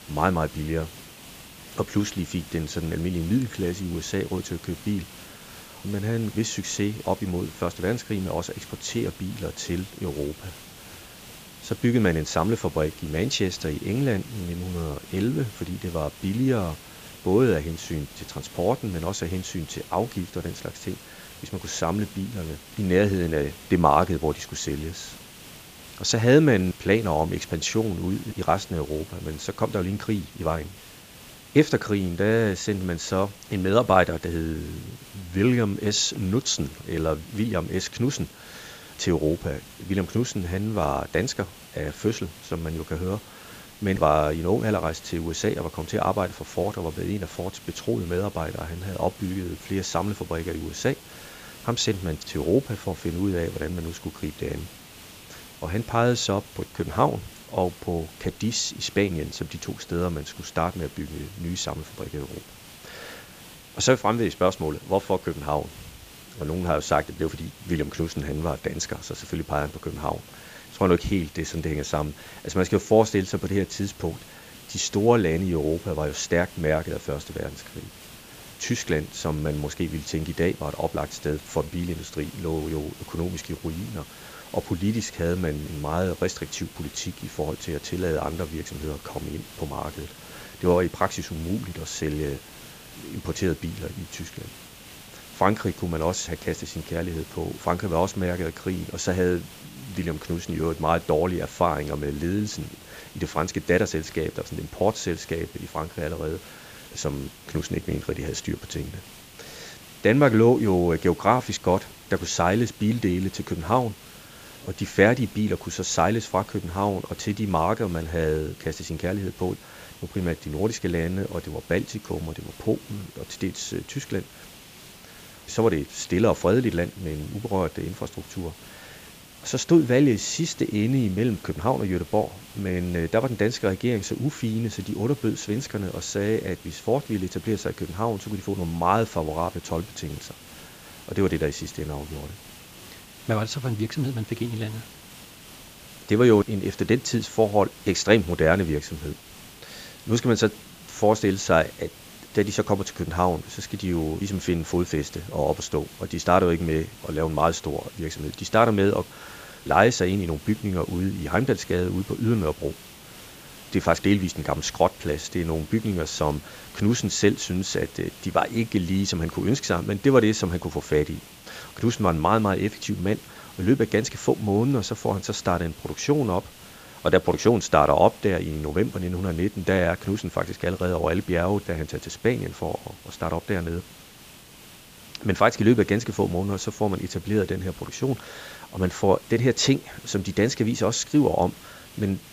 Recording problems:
high frequencies cut off; noticeable; nothing above 8 kHz
hiss; noticeable; throughout; 20 dB below the speech

